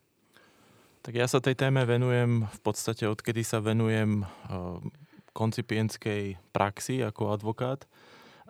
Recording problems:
none

